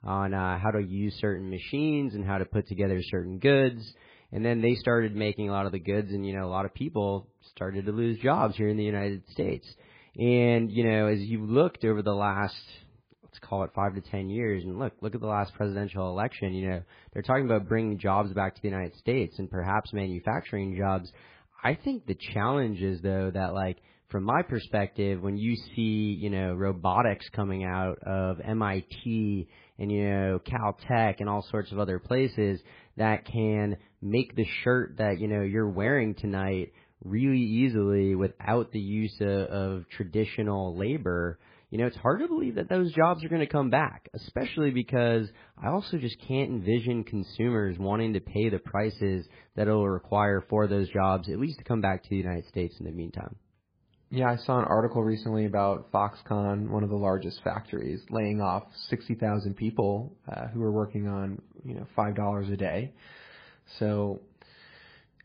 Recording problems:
garbled, watery; badly

